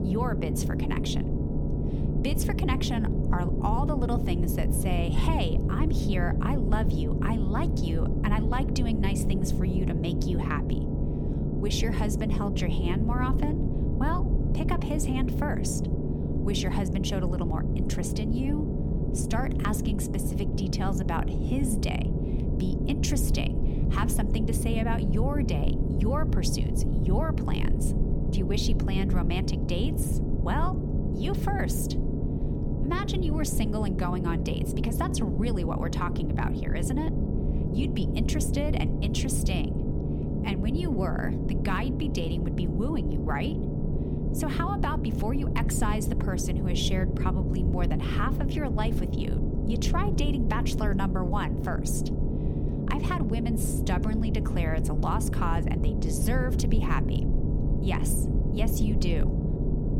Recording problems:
low rumble; loud; throughout; 3 dB below the speech

